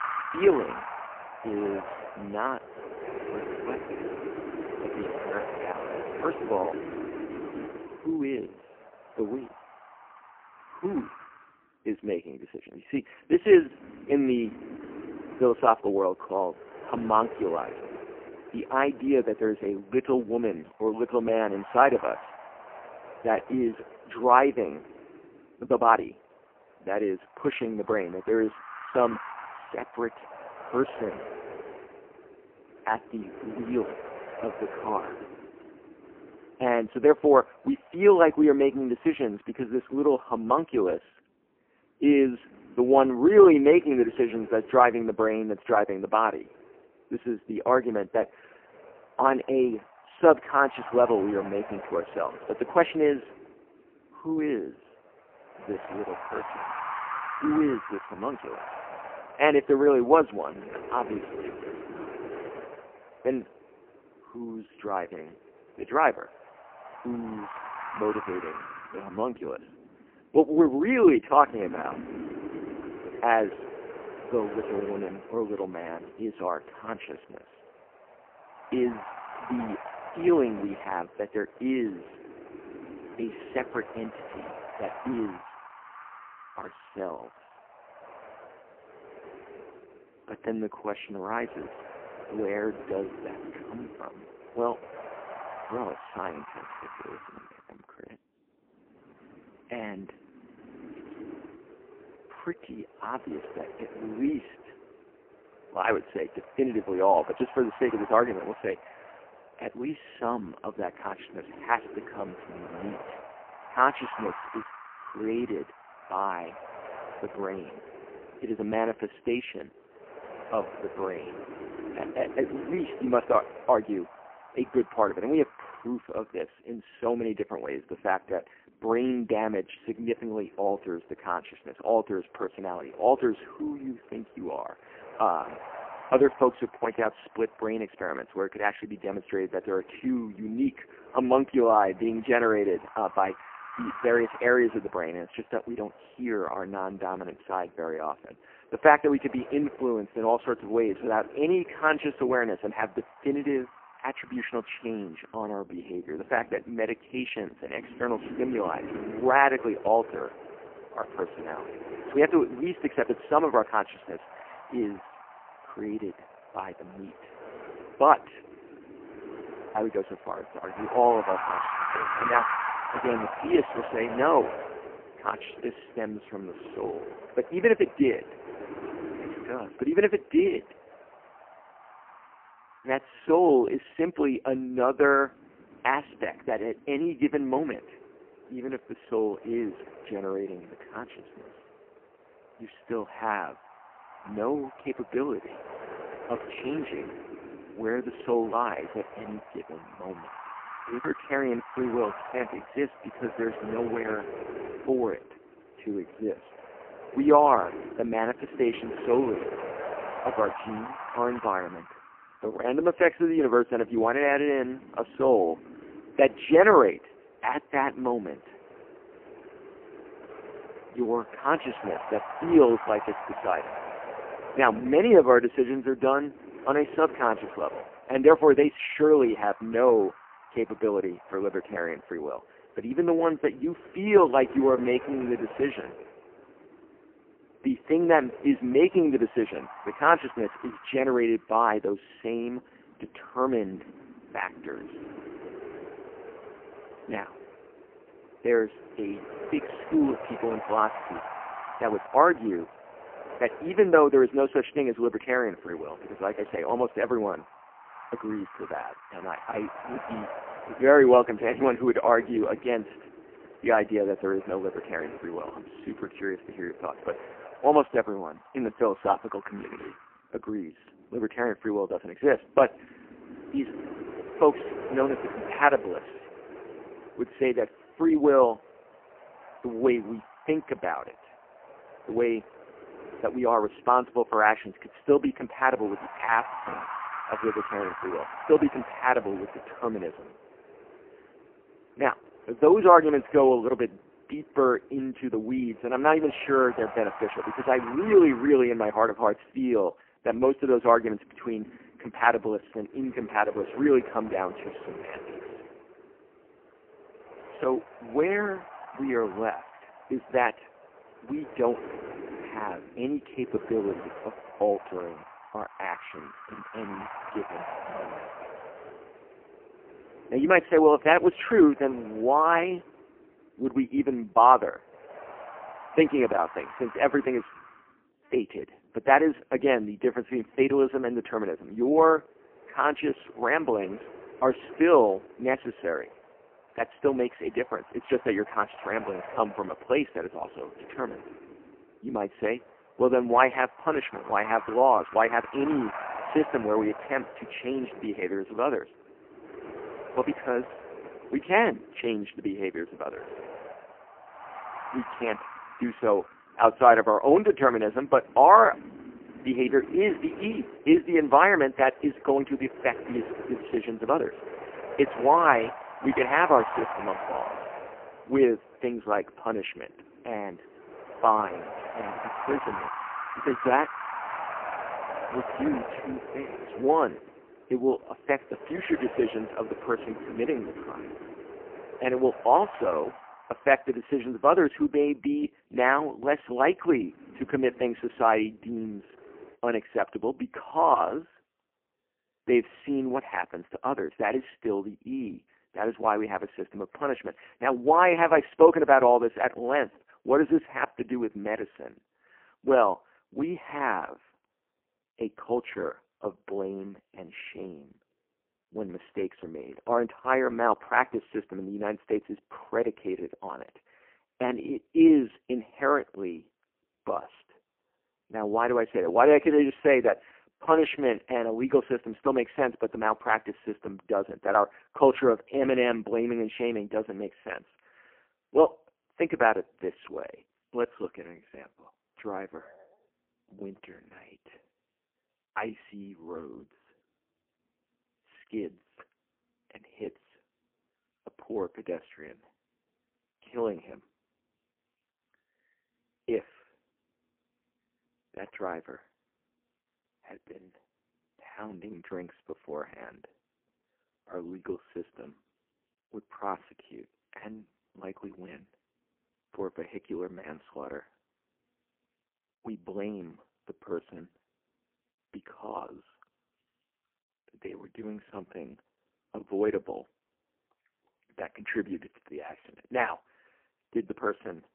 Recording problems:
phone-call audio; poor line
wind noise on the microphone; occasional gusts; until 6:29; 15 dB below the speech
uneven, jittery; strongly; from 23 s to 7:01

